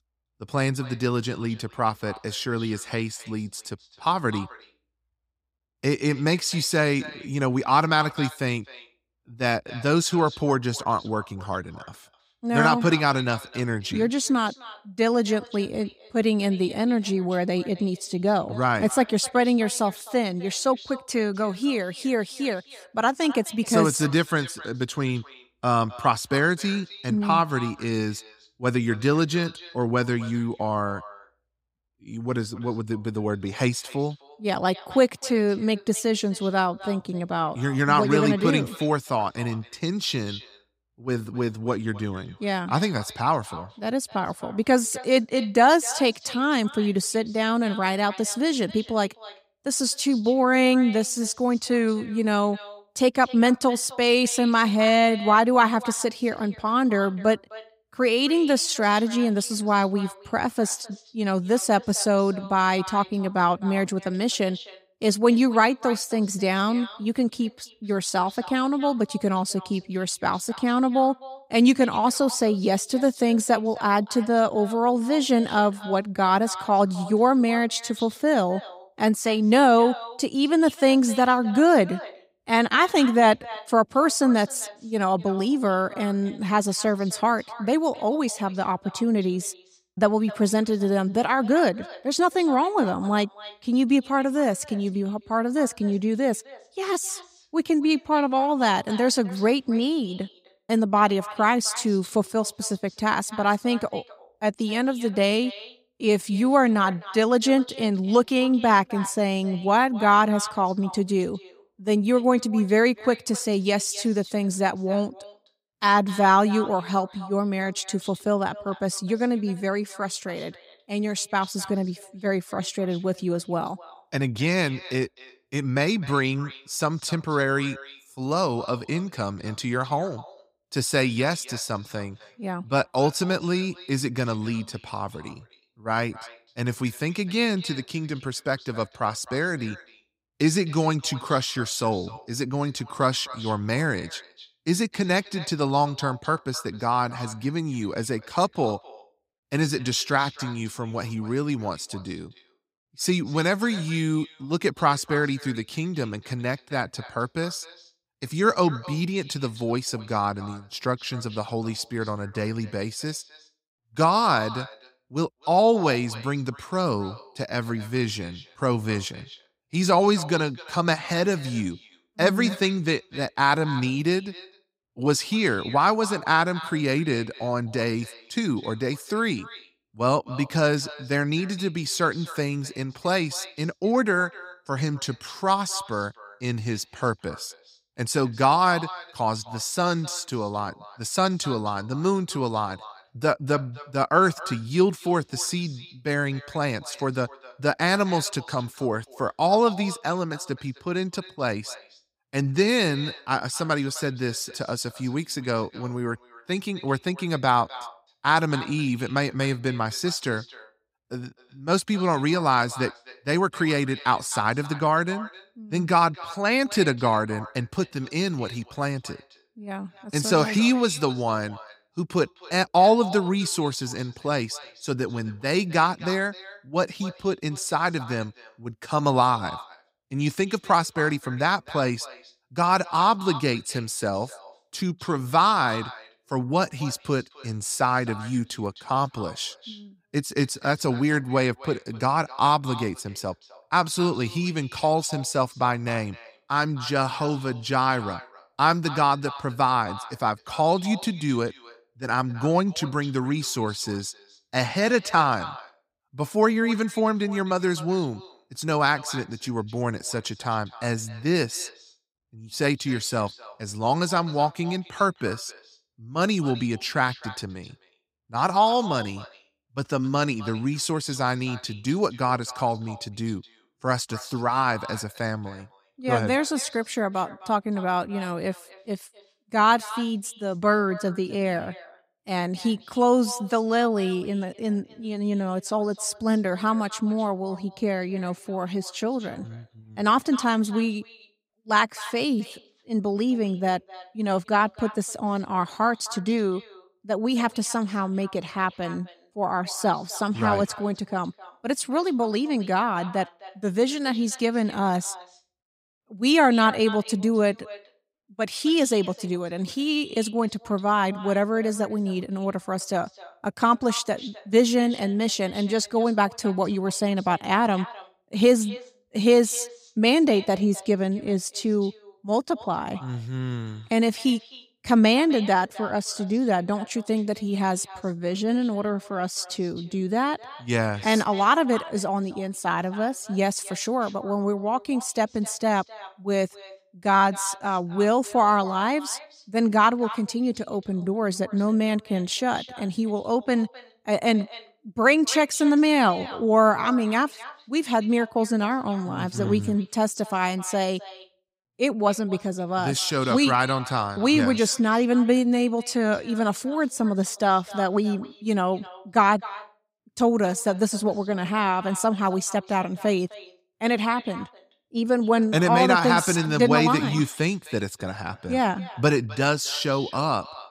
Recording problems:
echo of what is said; faint; throughout; 260 ms later, 20 dB below the speech

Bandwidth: 15.5 kHz